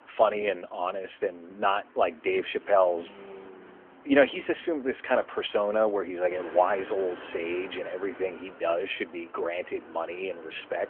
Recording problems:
phone-call audio; nothing above 3.5 kHz
traffic noise; noticeable; throughout; 20 dB below the speech

